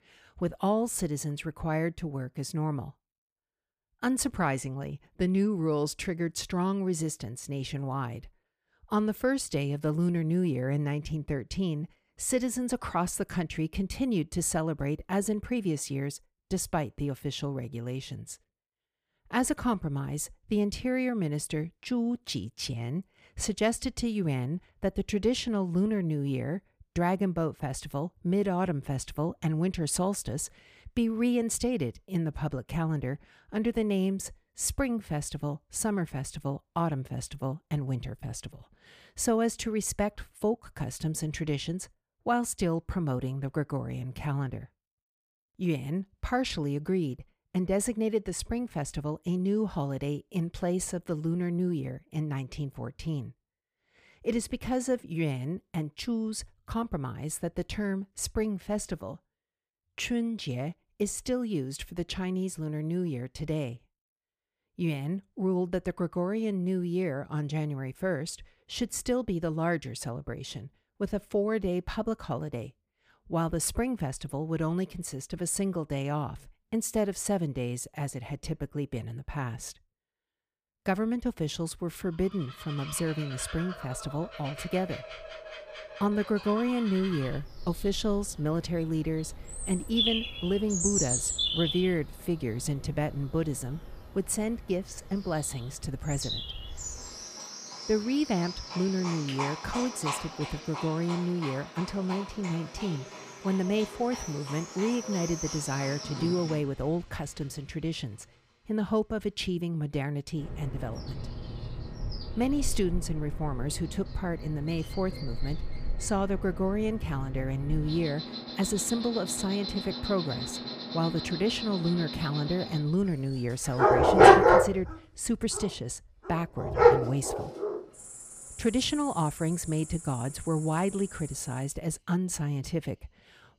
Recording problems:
animal sounds; very loud; from 1:23 on; 1 dB above the speech

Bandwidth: 15 kHz